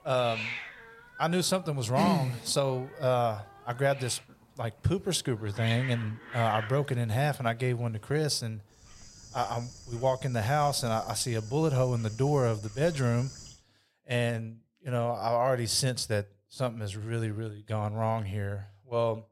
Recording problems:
animal sounds; noticeable; until 14 s; 15 dB below the speech

